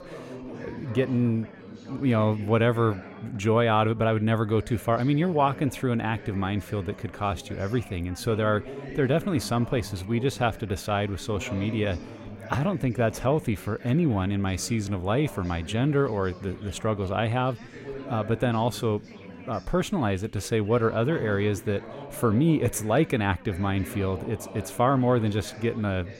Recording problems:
background chatter; noticeable; throughout; 4 voices, 15 dB below the speech

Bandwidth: 16 kHz